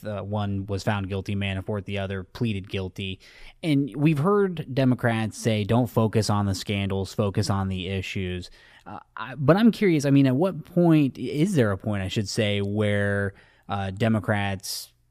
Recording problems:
none

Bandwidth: 14.5 kHz